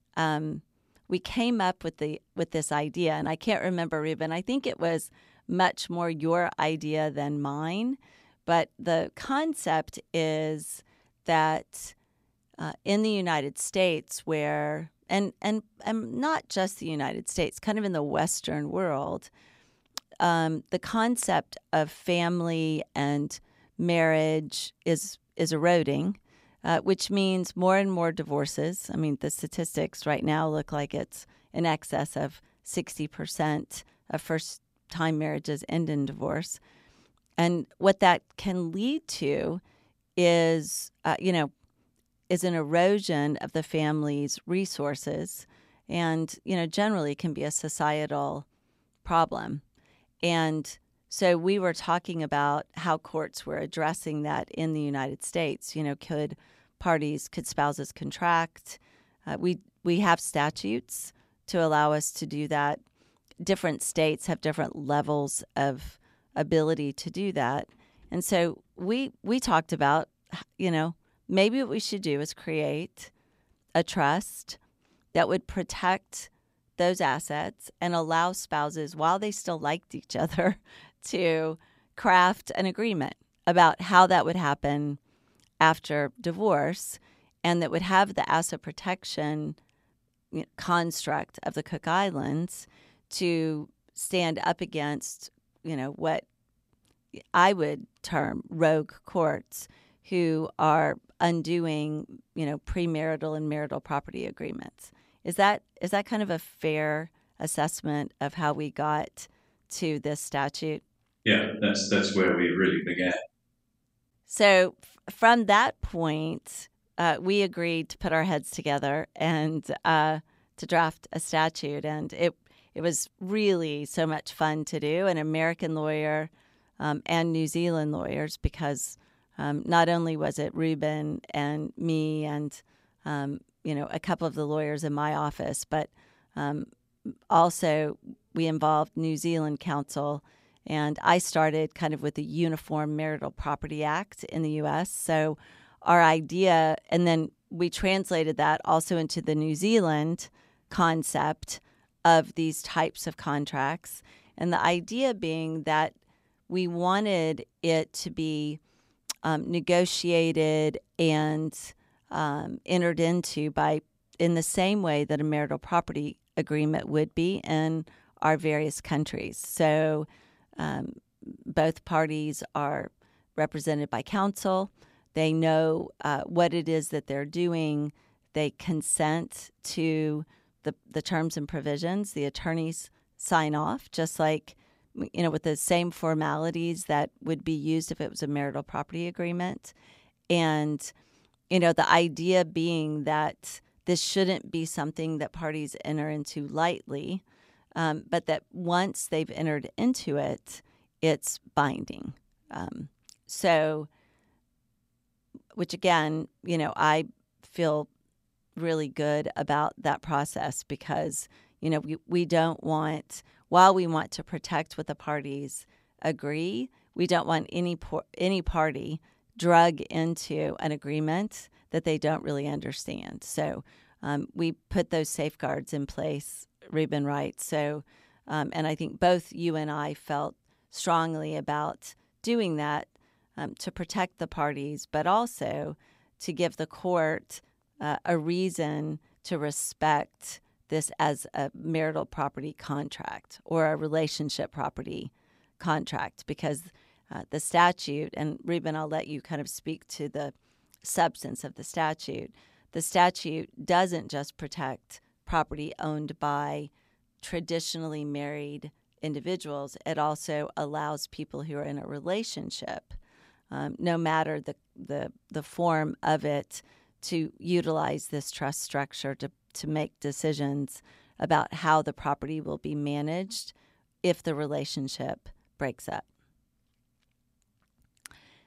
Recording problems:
none

